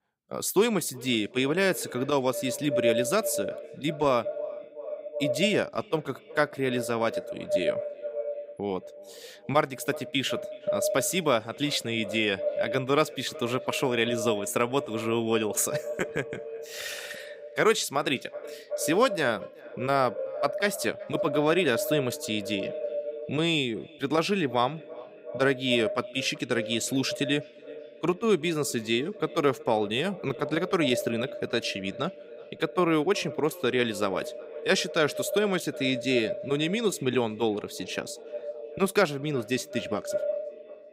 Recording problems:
echo of what is said; strong; throughout; 370 ms later, 8 dB below the speech

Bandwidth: 15.5 kHz